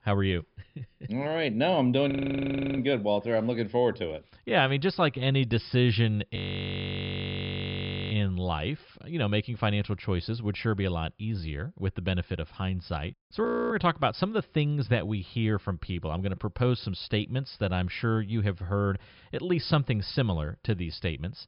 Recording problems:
high frequencies cut off; noticeable; nothing above 5.5 kHz
audio freezing; at 2 s for 0.5 s, at 6.5 s for 1.5 s and at 13 s

